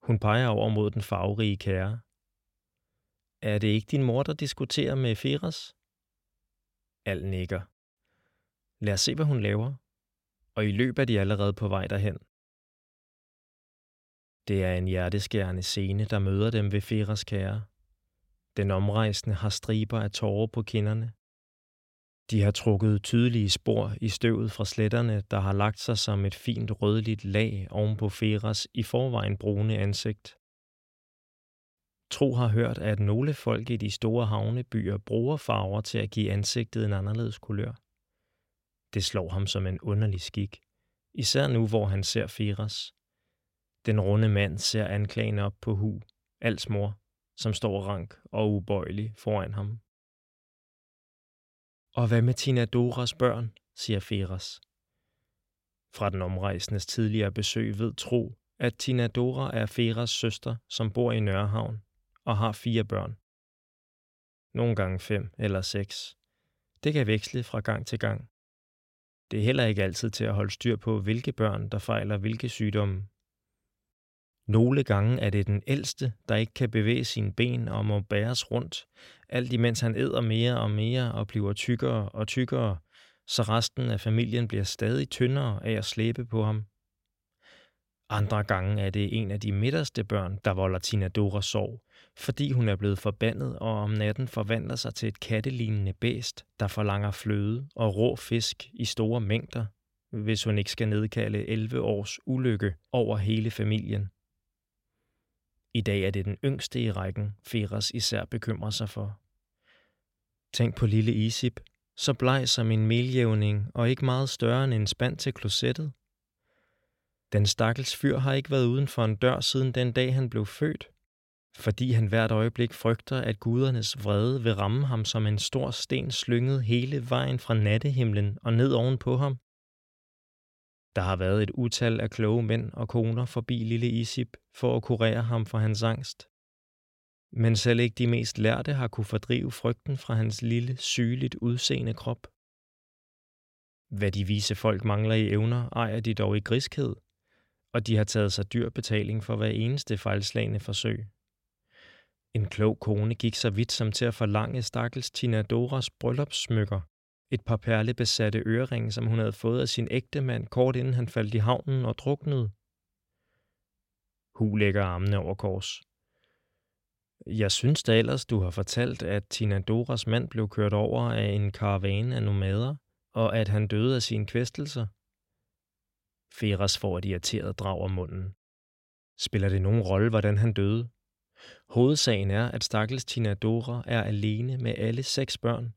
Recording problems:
none

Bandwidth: 16.5 kHz